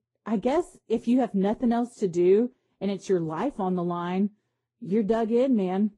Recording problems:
muffled; slightly; fading above 1 kHz
garbled, watery; slightly; nothing above 10.5 kHz

